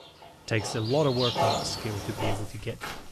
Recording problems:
animal sounds; loud; throughout; 1 dB below the speech

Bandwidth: 13.5 kHz